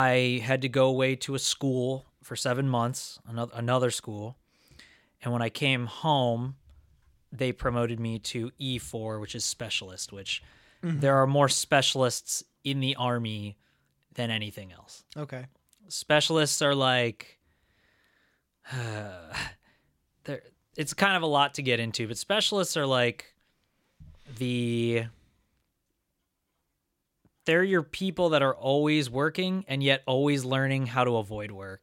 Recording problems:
abrupt cut into speech; at the start

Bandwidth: 16.5 kHz